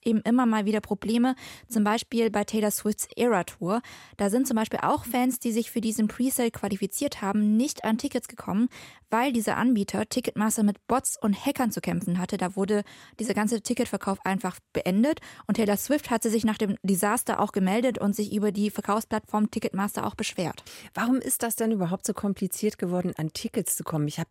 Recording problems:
none

